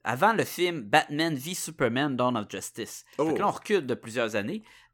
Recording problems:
none

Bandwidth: 17.5 kHz